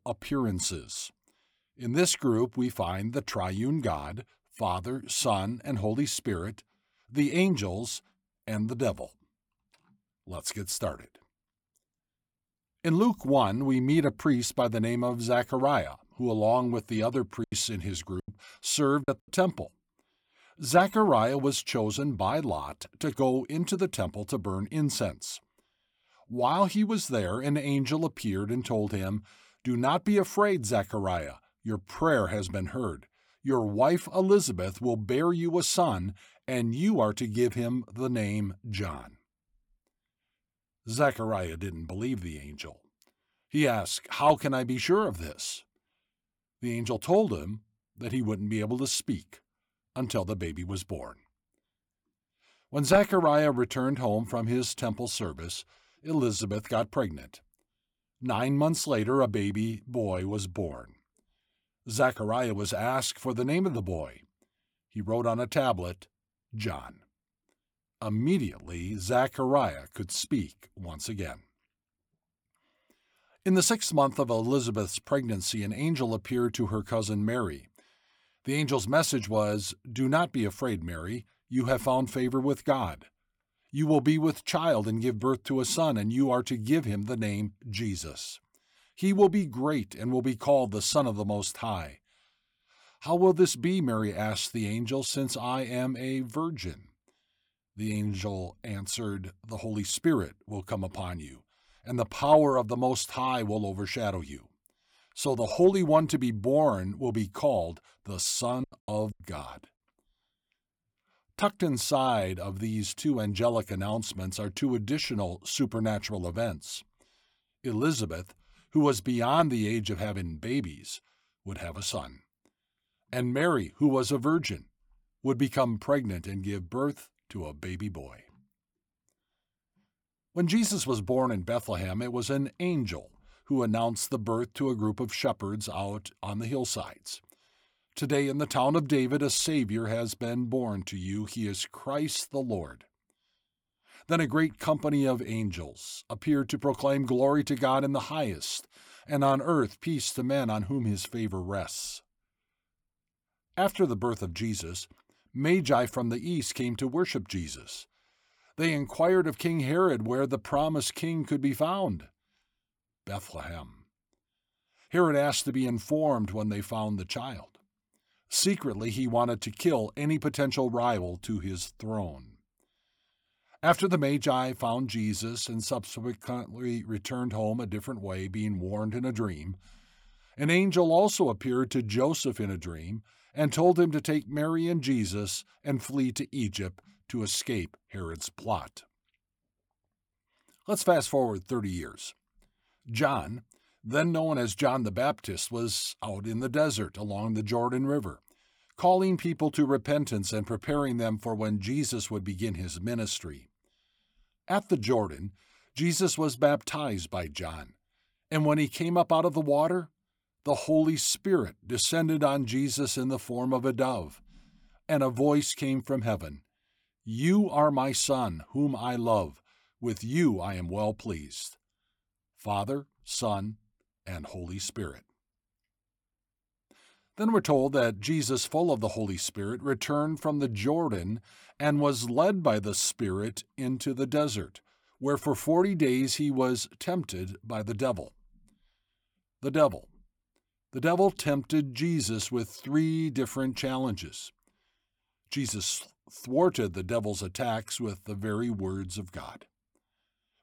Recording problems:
choppy; very; from 17 to 19 s and at 1:49; 12% of the speech affected

